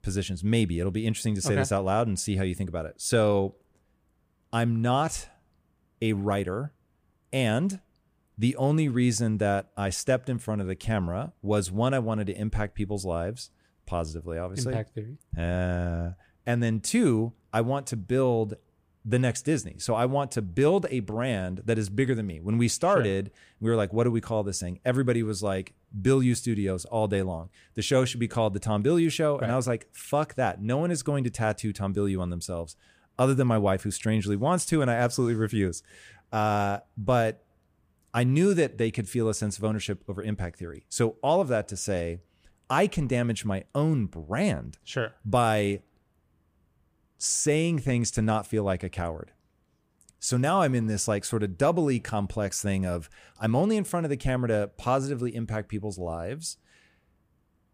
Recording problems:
none

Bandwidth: 15 kHz